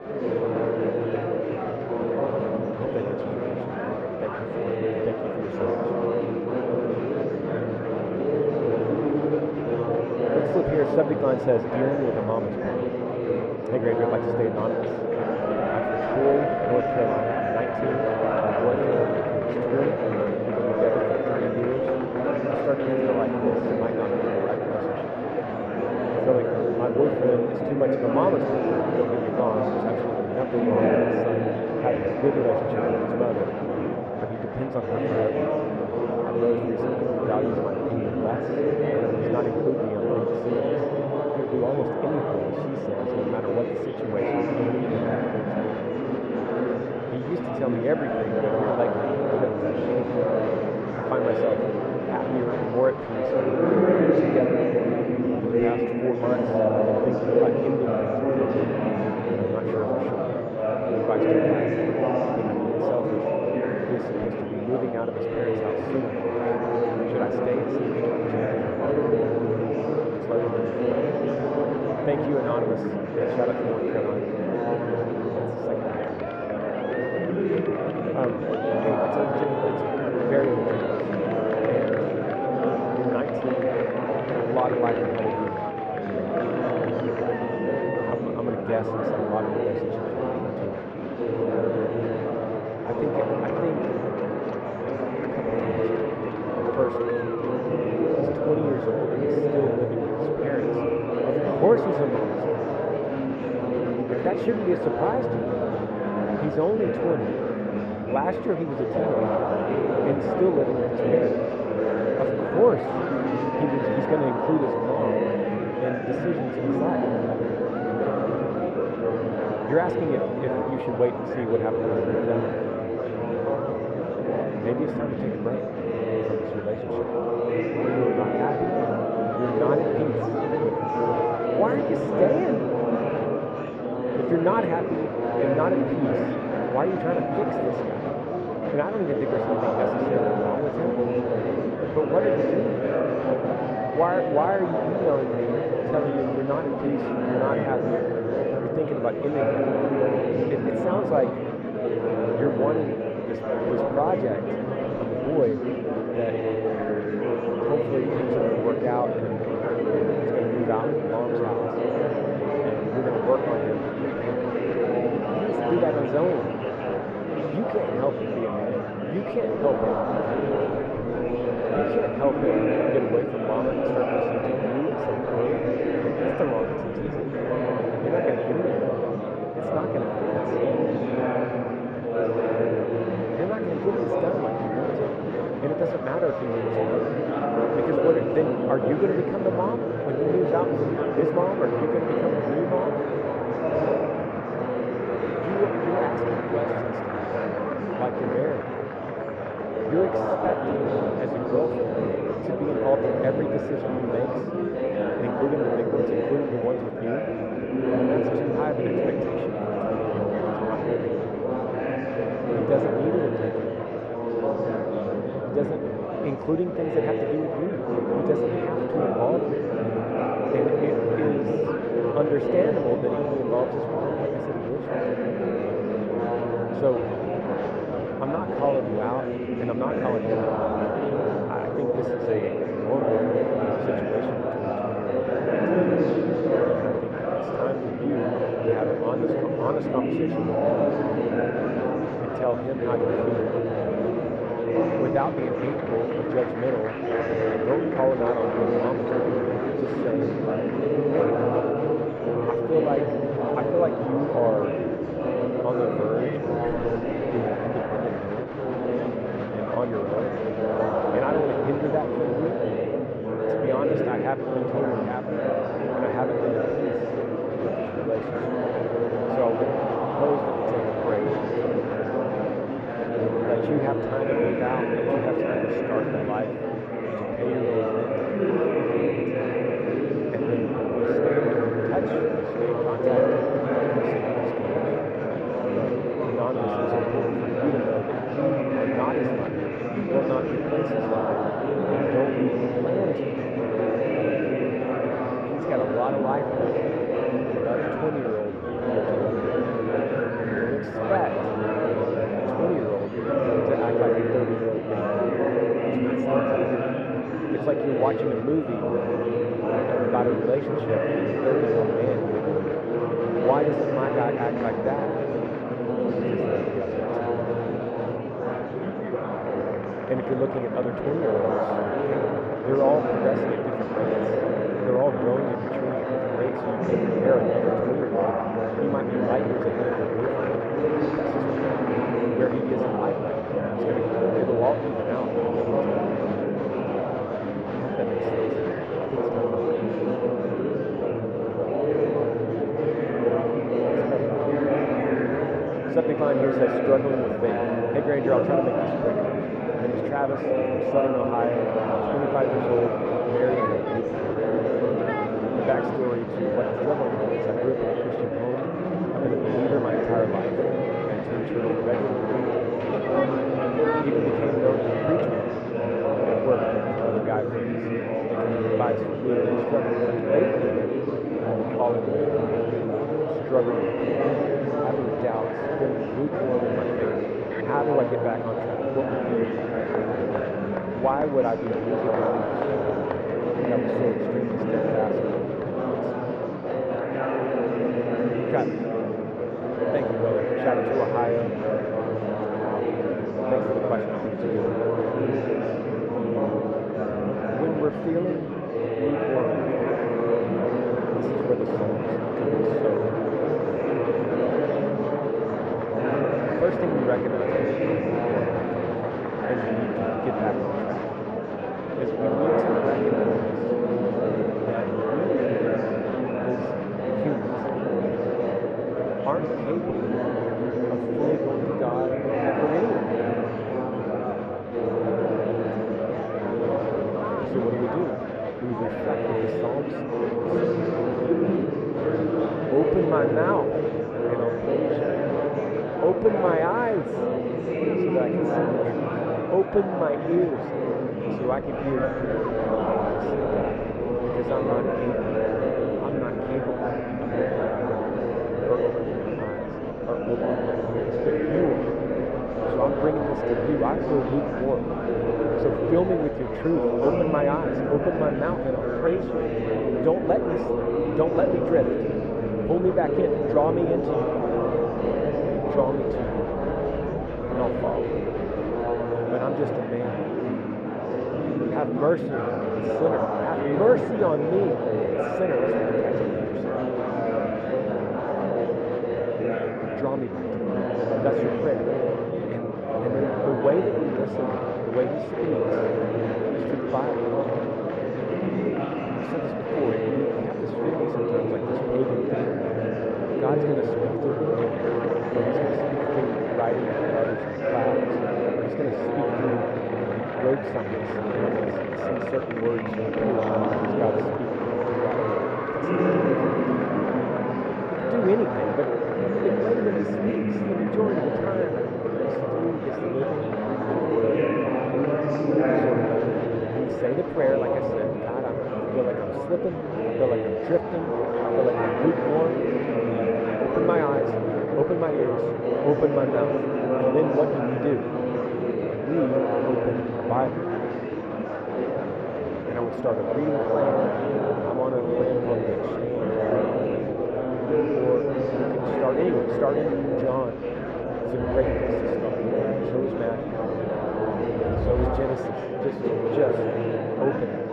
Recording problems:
muffled; very; fading above 3 kHz
murmuring crowd; very loud; throughout; 3 dB above the speech

